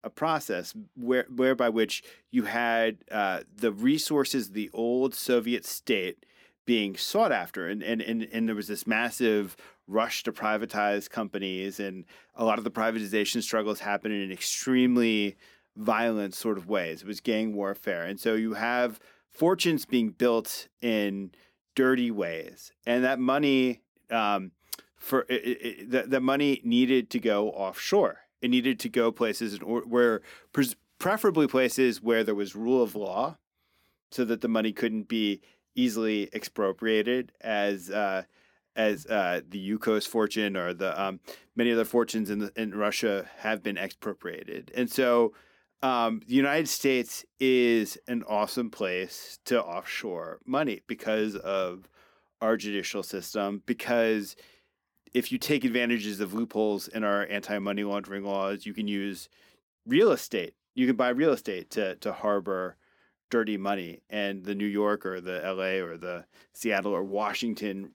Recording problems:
none

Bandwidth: 18.5 kHz